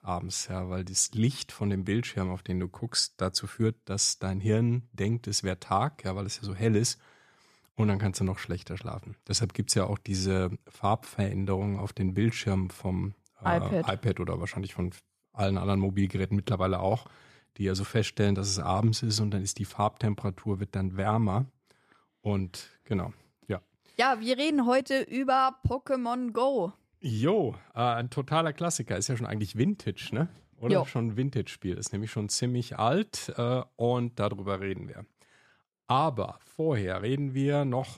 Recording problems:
none

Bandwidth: 14.5 kHz